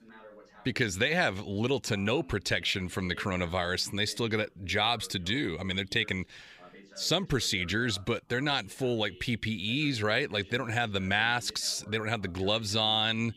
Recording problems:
voice in the background; faint; throughout; 25 dB below the speech

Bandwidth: 15 kHz